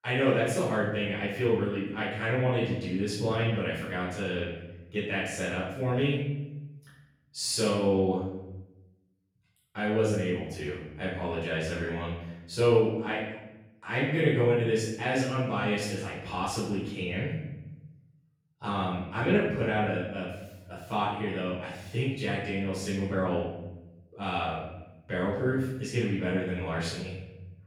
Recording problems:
off-mic speech; far
room echo; noticeable; dies away in 0.9 s

